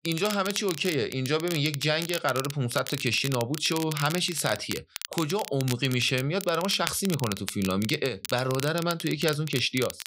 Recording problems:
crackle, like an old record; loud; 10 dB below the speech

